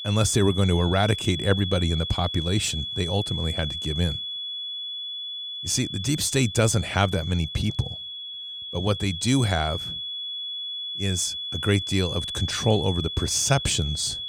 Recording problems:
high-pitched whine; loud; throughout; 3.5 kHz, 6 dB below the speech

